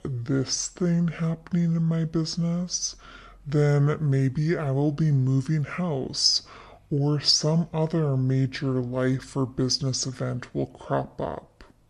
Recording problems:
wrong speed and pitch; too slow and too low; 0.7 times normal speed

